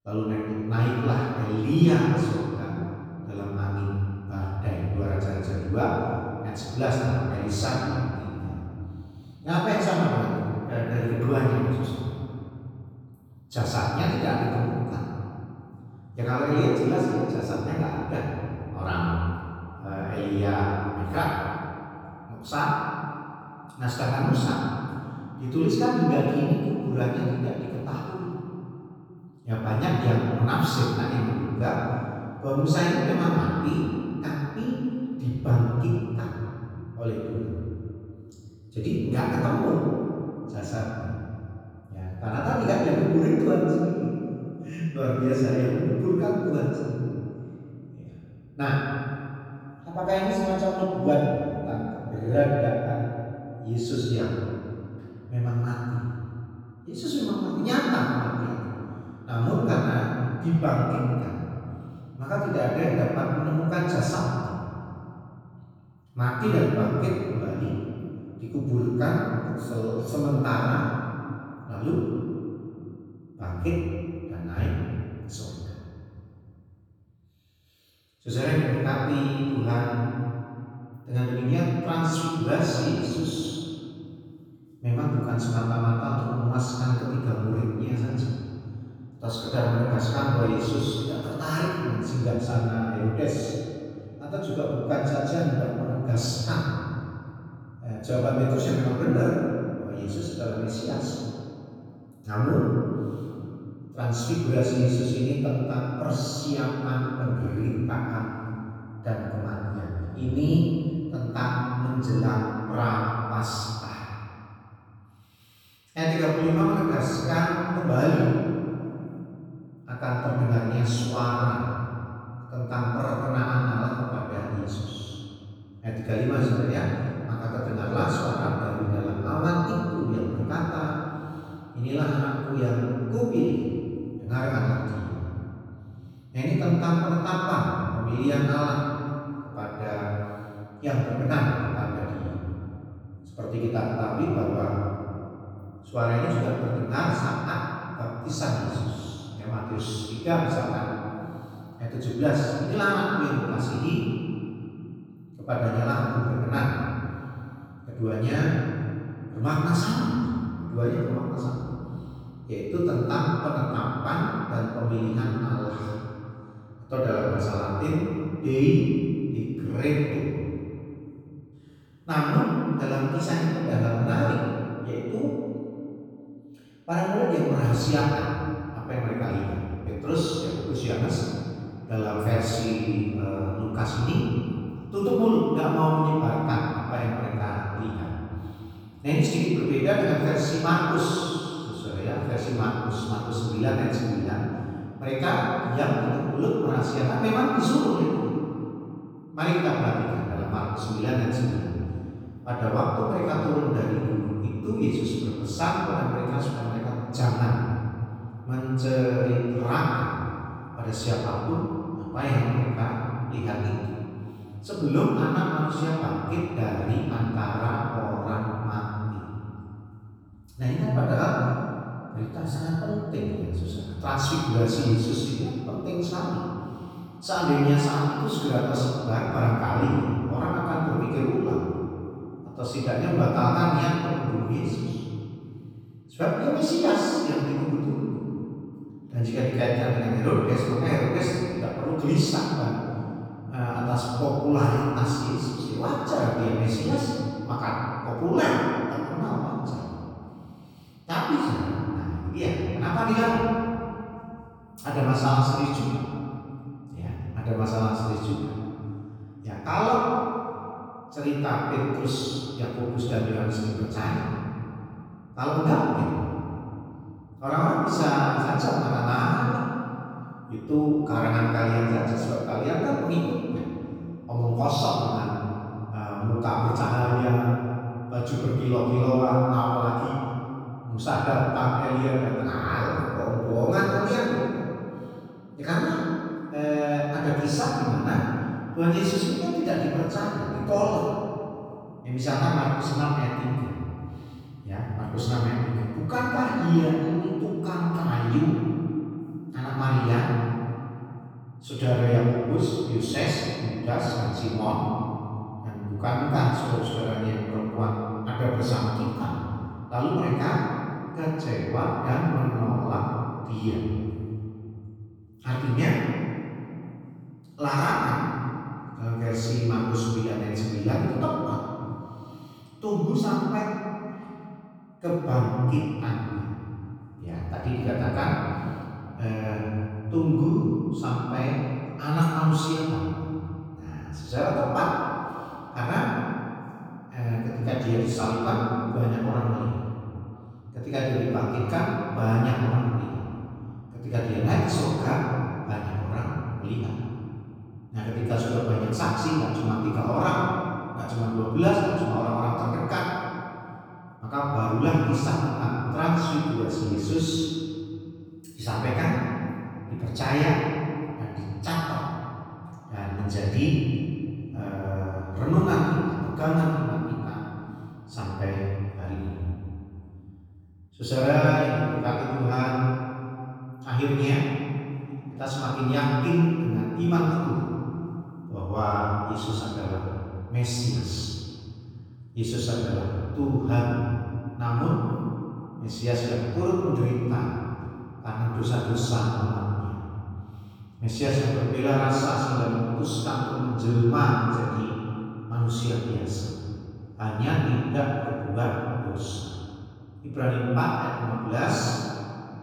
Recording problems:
room echo; strong; dies away in 2.6 s
off-mic speech; far

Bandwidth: 18.5 kHz